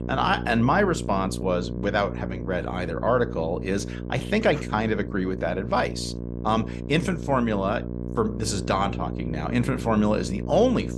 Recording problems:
electrical hum; noticeable; throughout; 60 Hz, 15 dB below the speech

